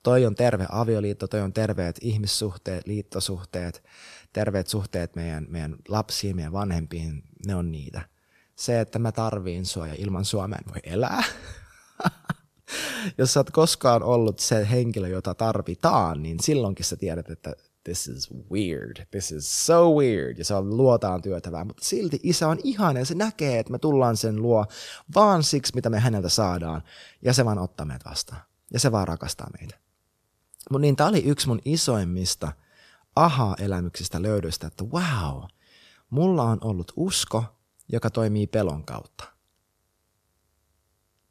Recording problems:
none

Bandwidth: 14 kHz